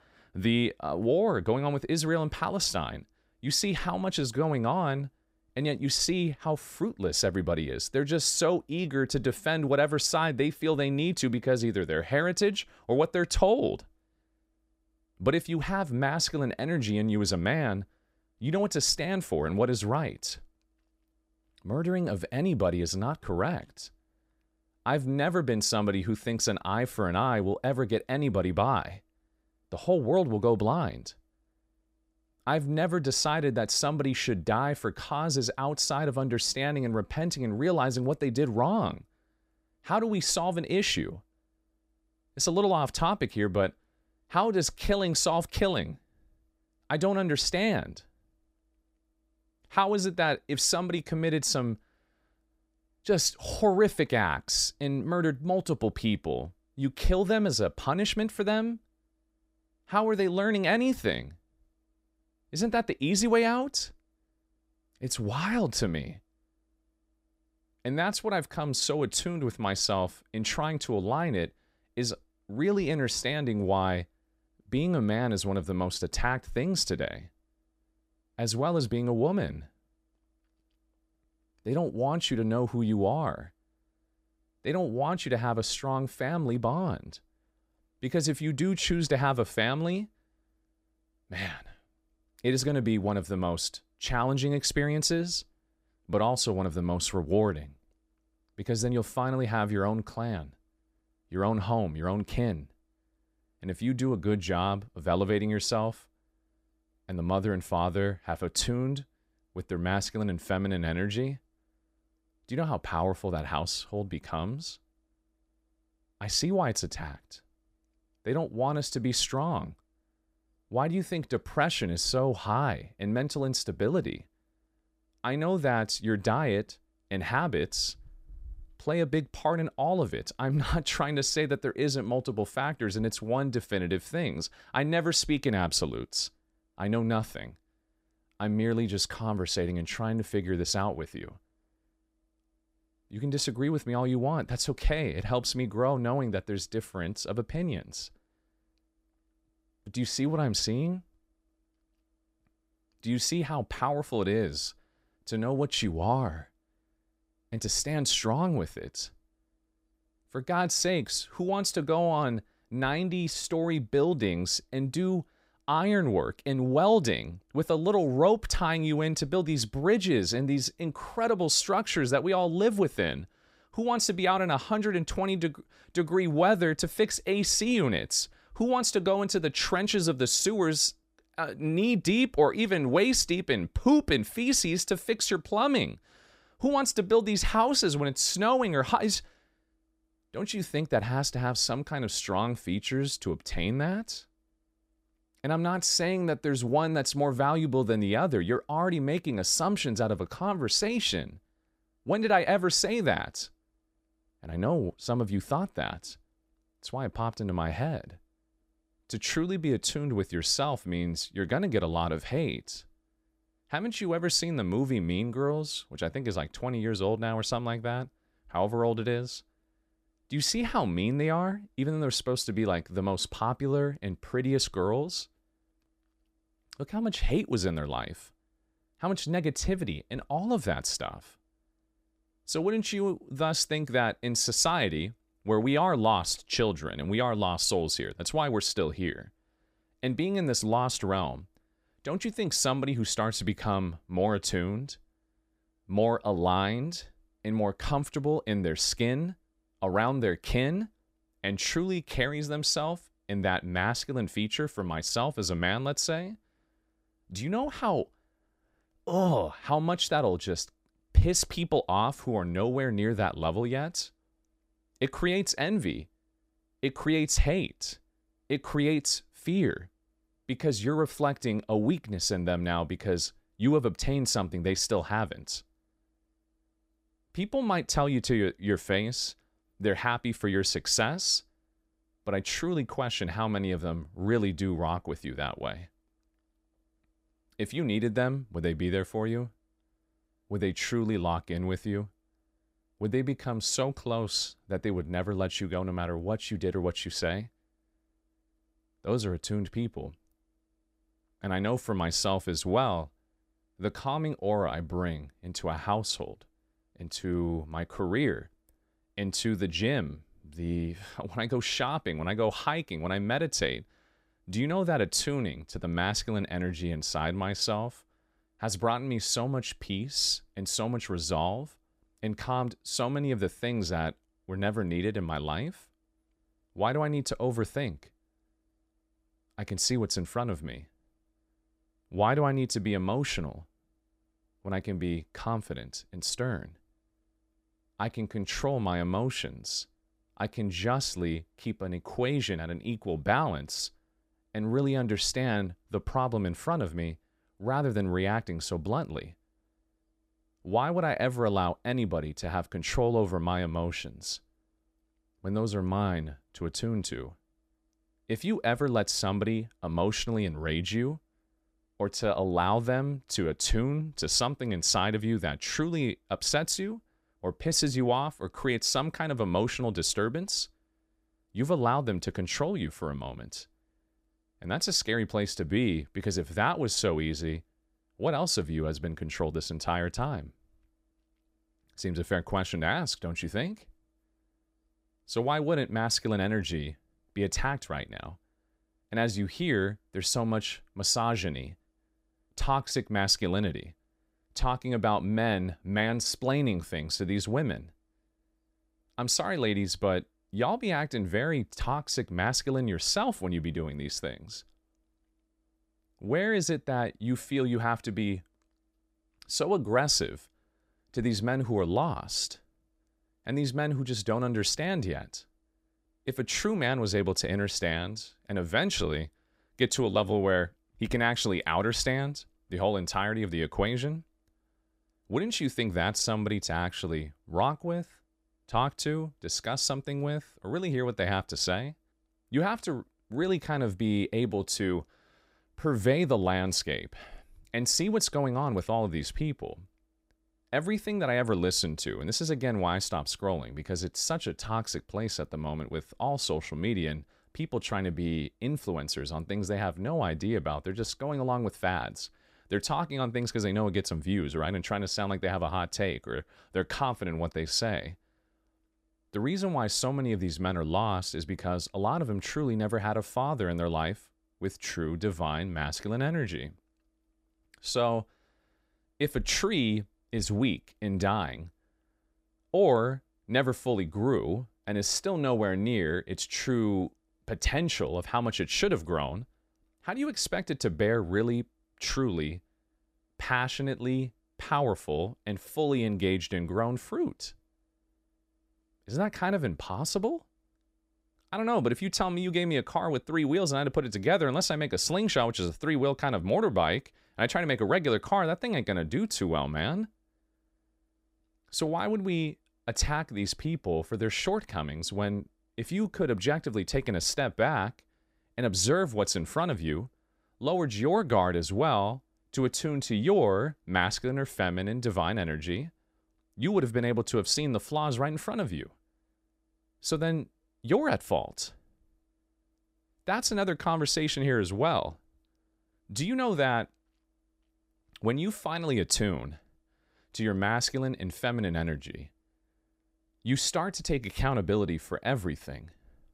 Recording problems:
none

